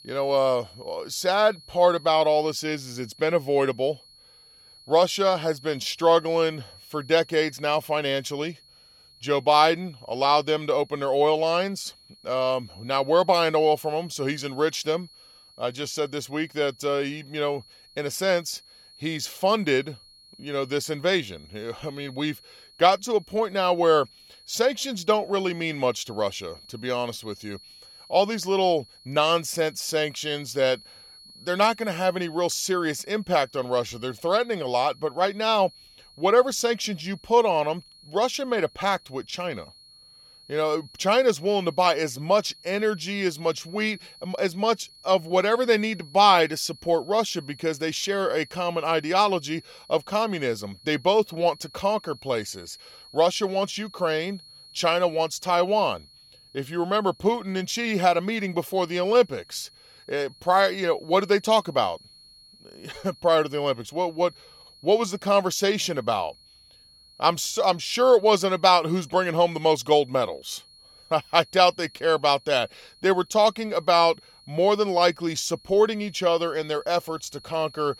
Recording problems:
high-pitched whine; faint; throughout; 4.5 kHz, 25 dB below the speech

